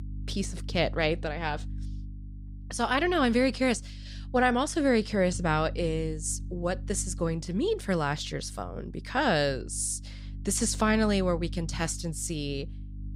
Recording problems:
electrical hum; faint; throughout; 50 Hz, 25 dB below the speech

